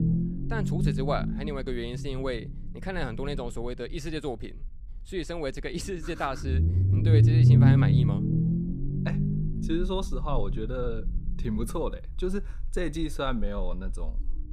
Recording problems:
low rumble; loud; throughout; 1 dB below the speech

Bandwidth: 15.5 kHz